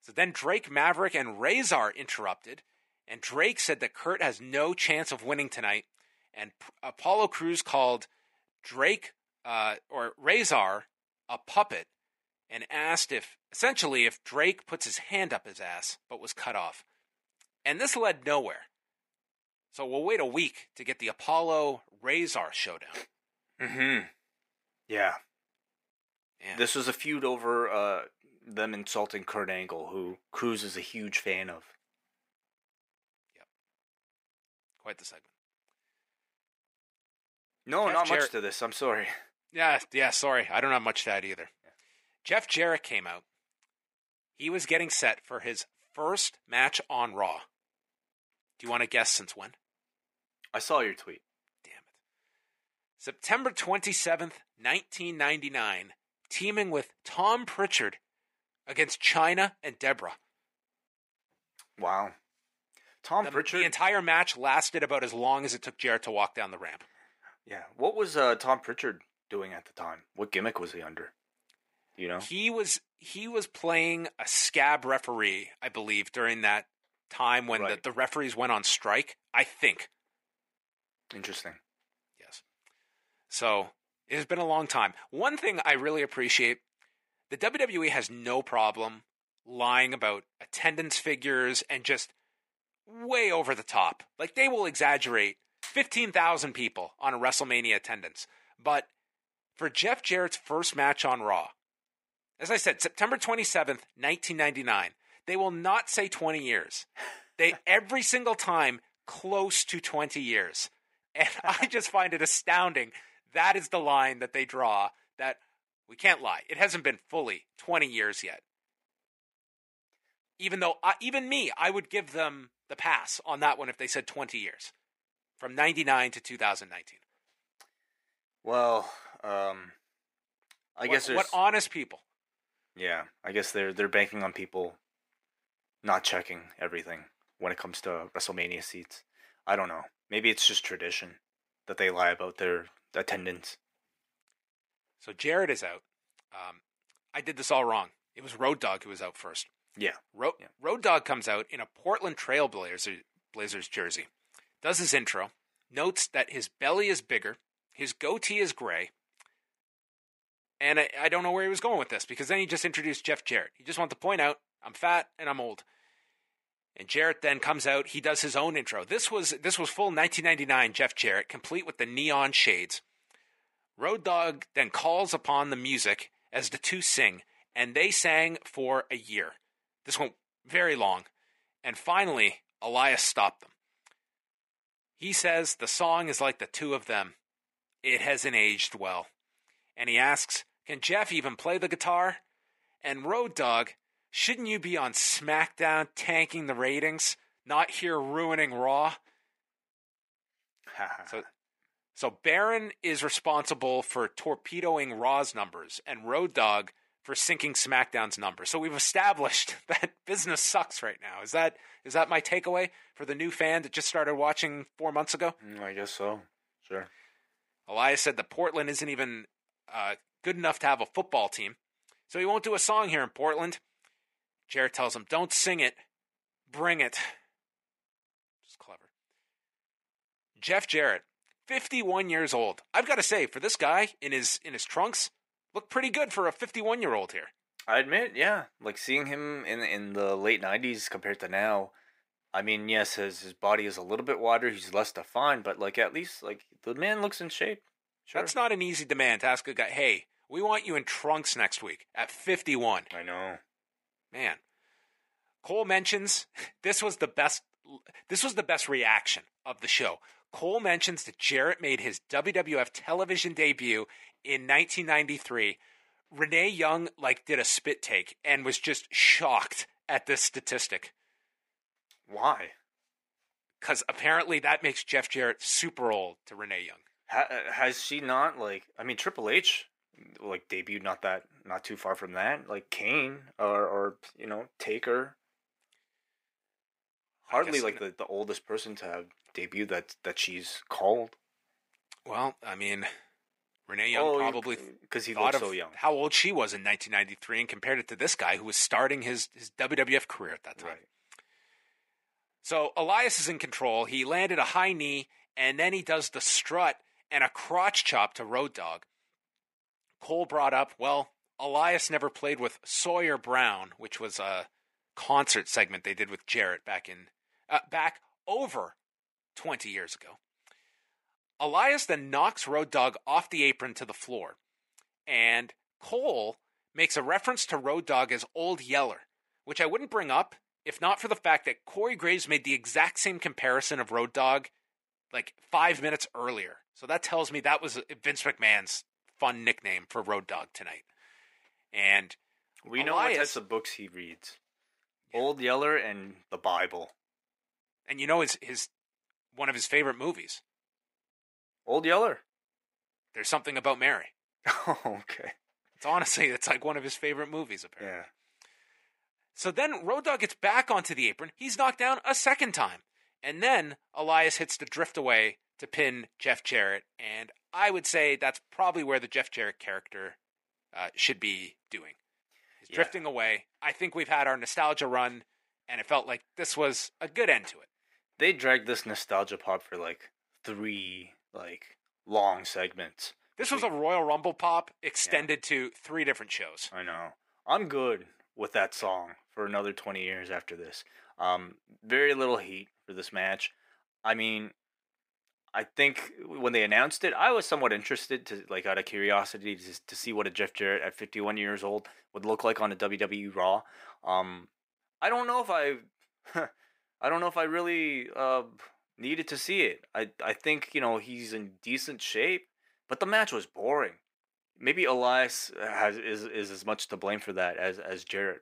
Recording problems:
thin; somewhat; fading below 400 Hz

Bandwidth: 15.5 kHz